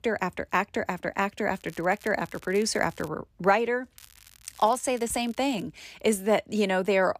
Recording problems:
crackling; faint; from 1.5 to 3 s and from 4 to 5.5 s; 25 dB below the speech

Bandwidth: 14.5 kHz